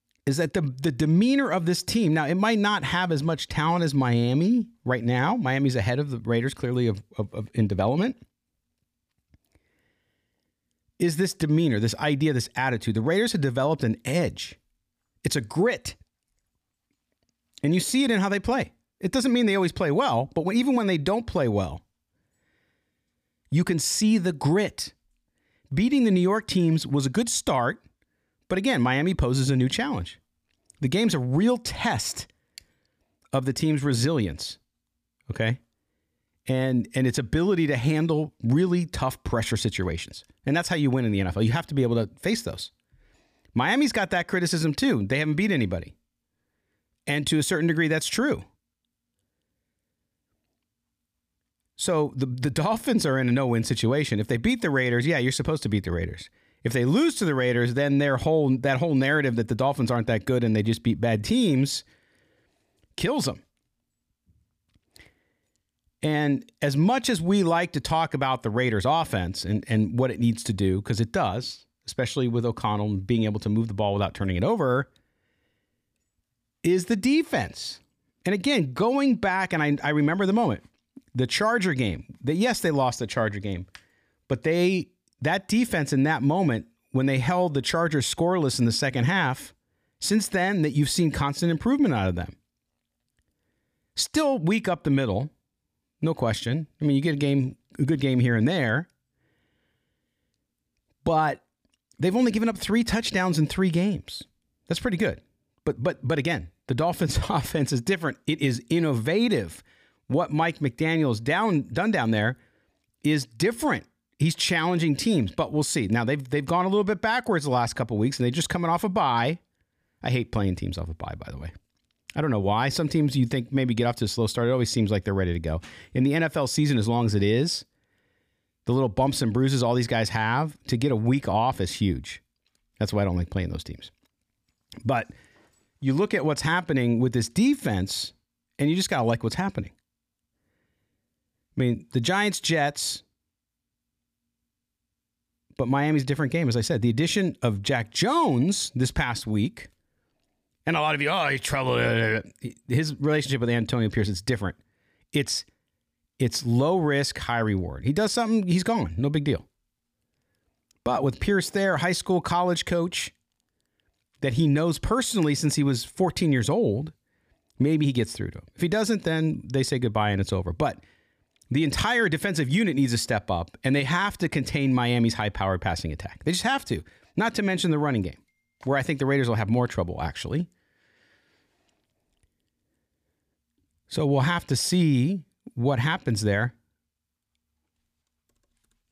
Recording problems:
none

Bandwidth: 15 kHz